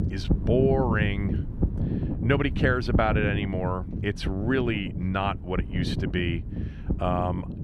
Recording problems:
wind noise on the microphone; heavy; 10 dB below the speech

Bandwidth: 13.5 kHz